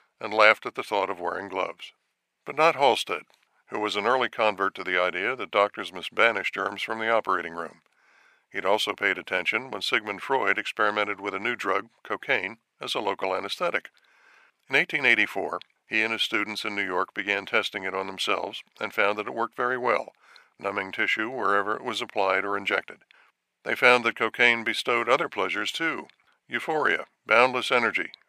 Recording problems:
thin; very; fading below 550 Hz

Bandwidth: 15 kHz